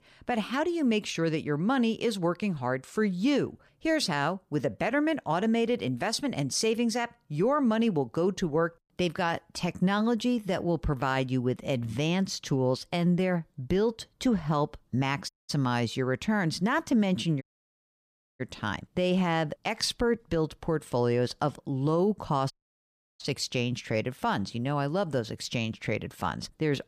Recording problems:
audio cutting out; at 15 s, at 17 s for 1 s and at 23 s for 0.5 s

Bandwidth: 15 kHz